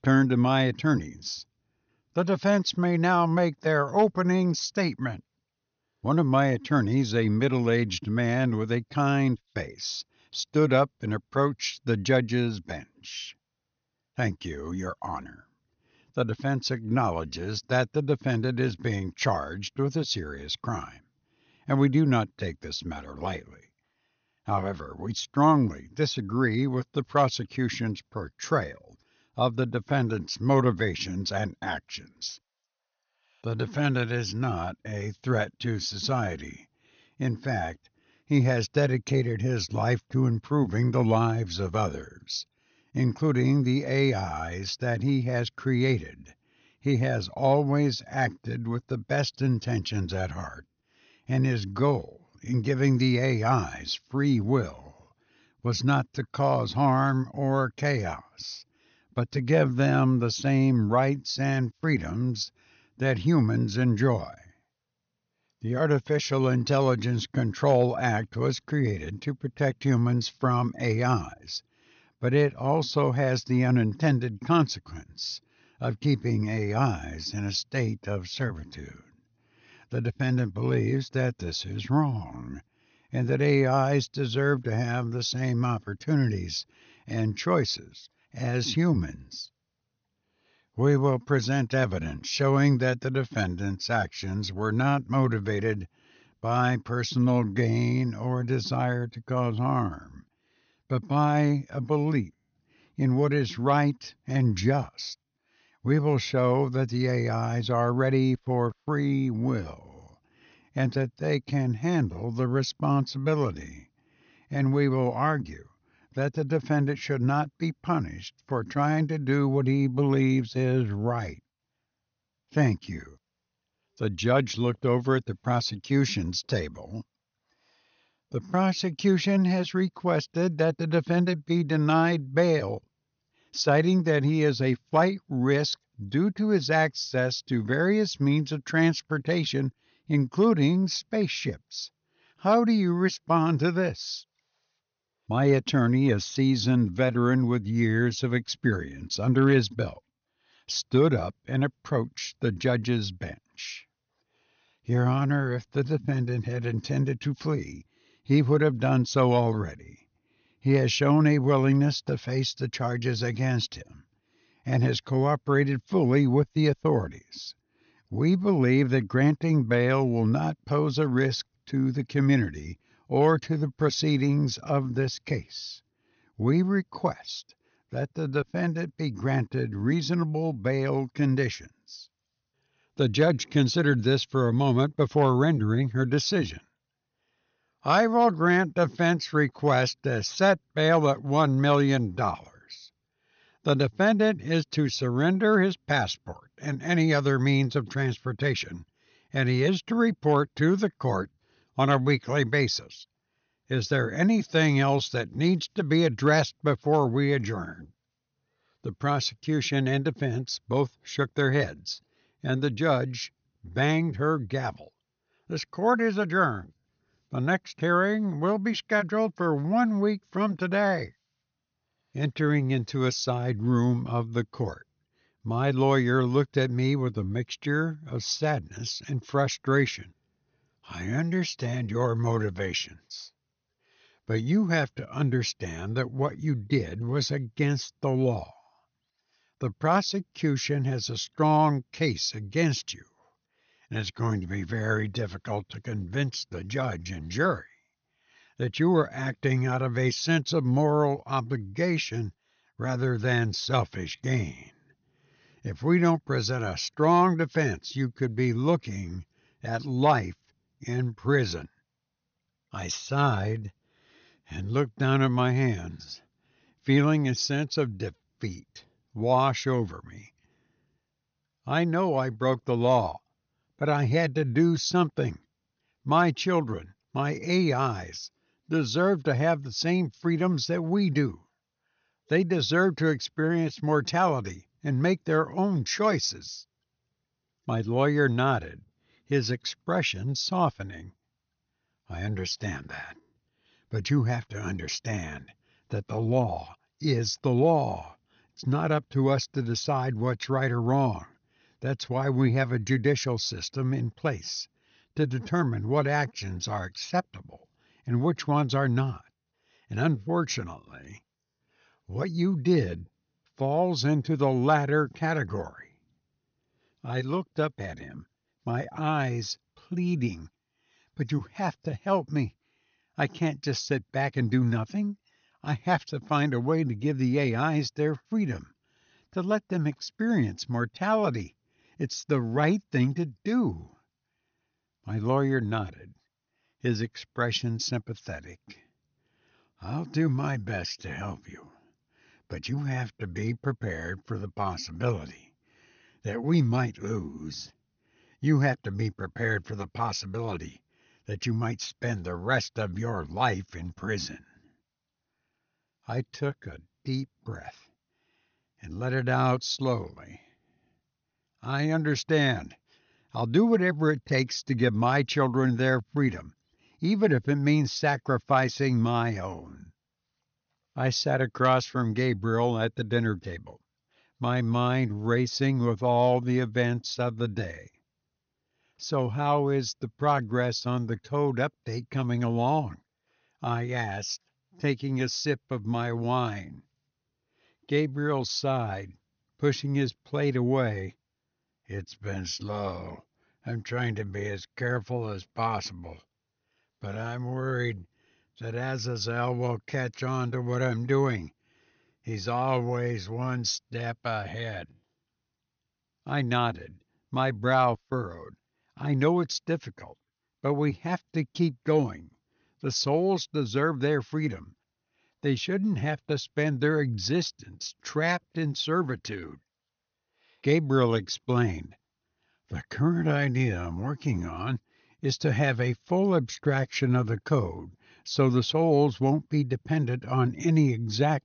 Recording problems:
high frequencies cut off; noticeable; nothing above 6.5 kHz

